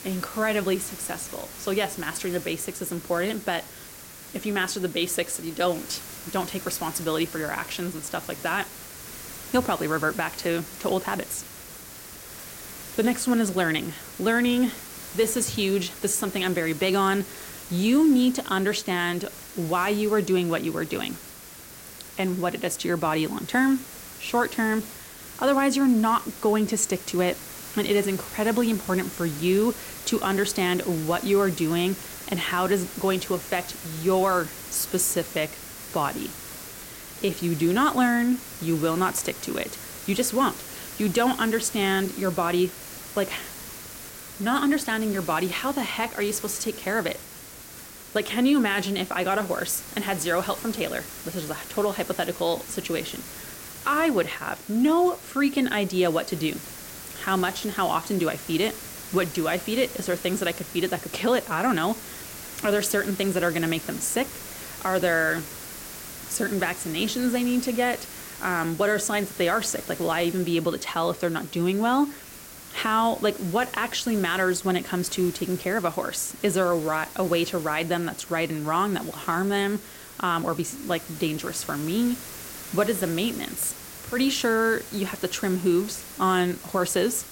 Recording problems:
hiss; noticeable; throughout; 10 dB below the speech

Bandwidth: 16.5 kHz